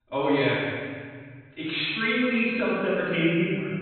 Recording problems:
room echo; strong; dies away in 1.7 s
off-mic speech; far
high frequencies cut off; severe; nothing above 4 kHz

